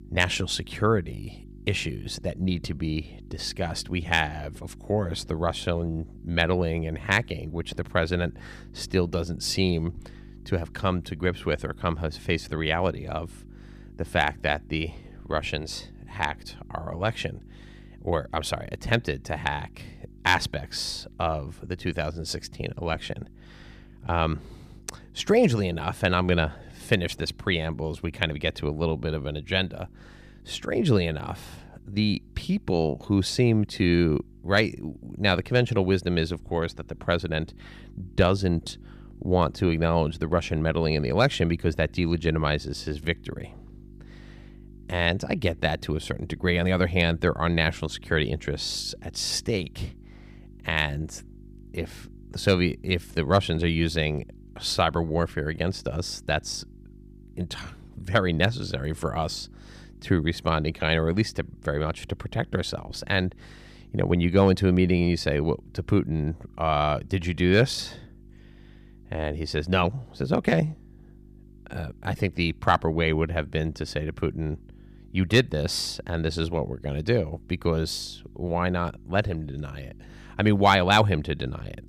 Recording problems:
electrical hum; faint; throughout; 50 Hz, 30 dB below the speech

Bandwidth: 15 kHz